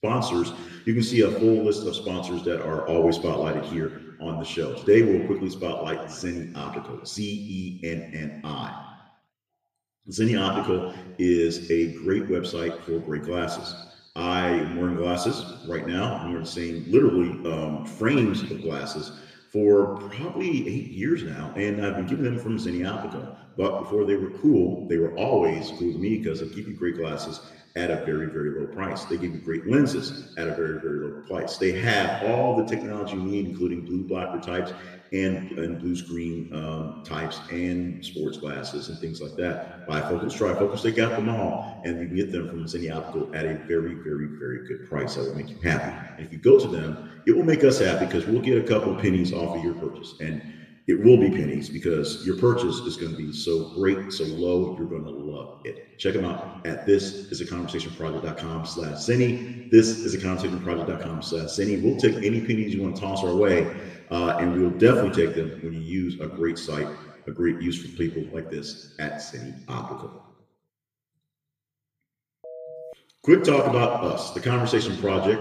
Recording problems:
room echo; slight; dies away in 1.2 s
off-mic speech; somewhat distant
phone ringing; faint; at 1:12; peak 15 dB below the speech

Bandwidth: 15 kHz